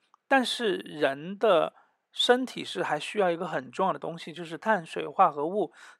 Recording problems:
uneven, jittery; strongly; from 0.5 to 5 s

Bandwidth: 16.5 kHz